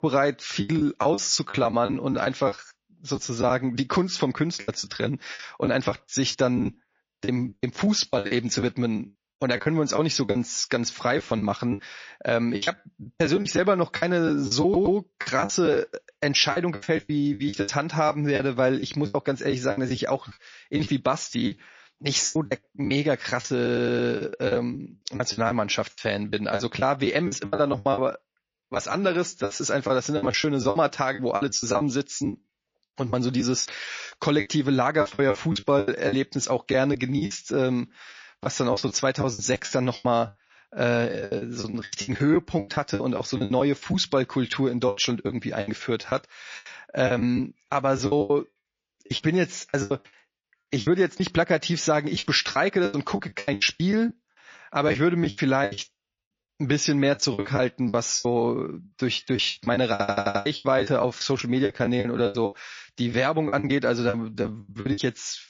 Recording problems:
garbled, watery; slightly; nothing above 6 kHz
choppy; very; 15% of the speech affected
audio stuttering; at 15 s, at 24 s and at 1:00

